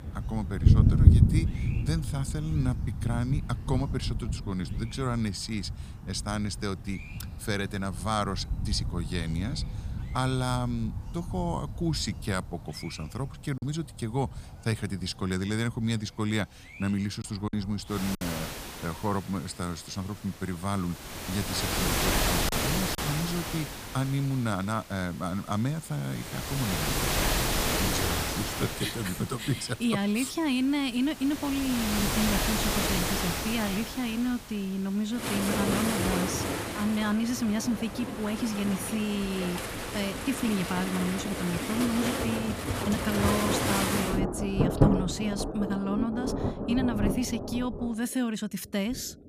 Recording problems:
rain or running water; very loud; throughout; 1 dB above the speech
choppy; occasionally; at 14 s, at 17 s and at 22 s; 4% of the speech affected

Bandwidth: 15 kHz